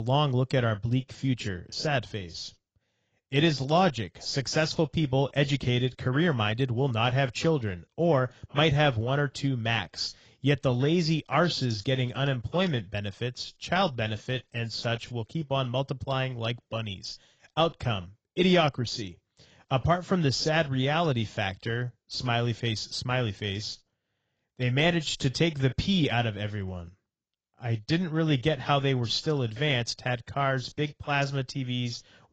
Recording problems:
garbled, watery; badly; nothing above 7.5 kHz
abrupt cut into speech; at the start

